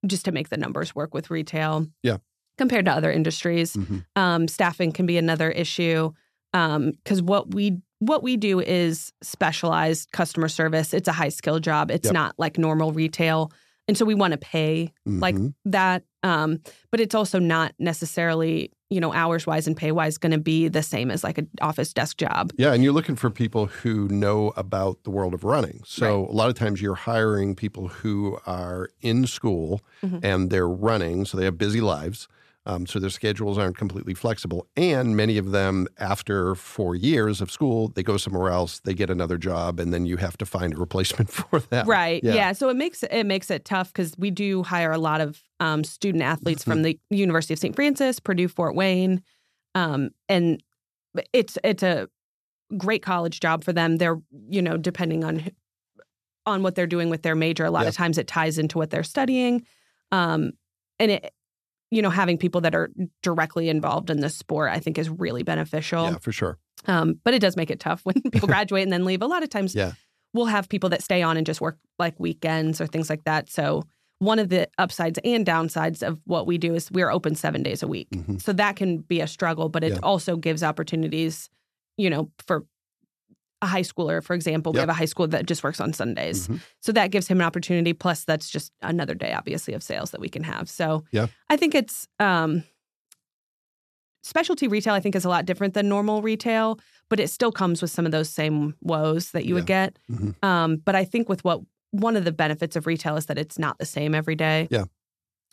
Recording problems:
uneven, jittery; strongly; from 1.5 s to 1:35

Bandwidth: 14 kHz